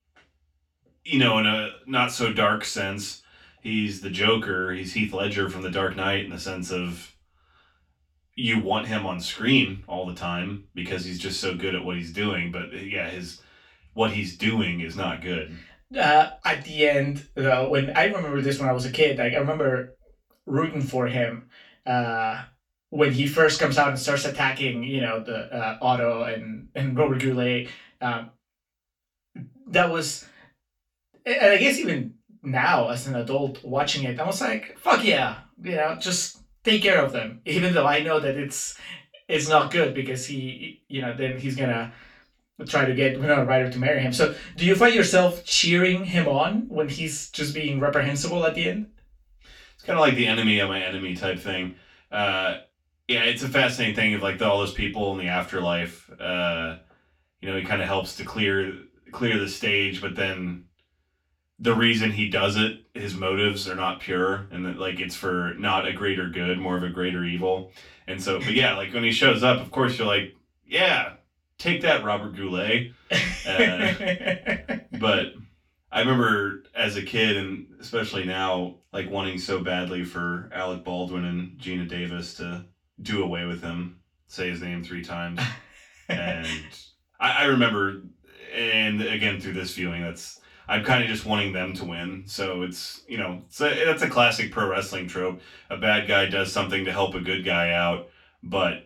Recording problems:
off-mic speech; far
room echo; slight; dies away in 0.2 s

